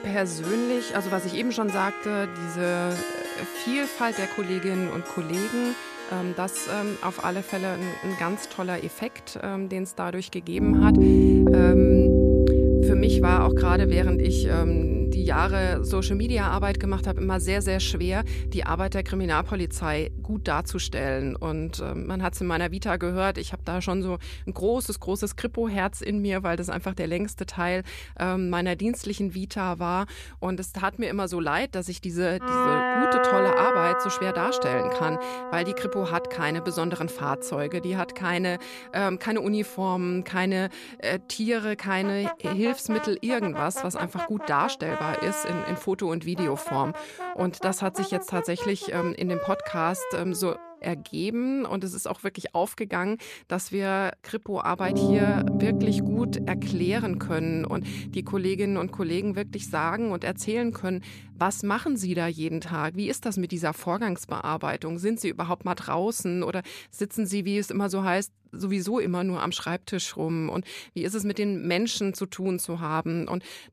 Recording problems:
background music; very loud; throughout; 2 dB above the speech

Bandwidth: 14.5 kHz